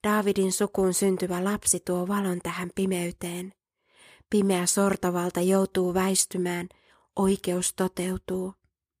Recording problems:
none

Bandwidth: 15 kHz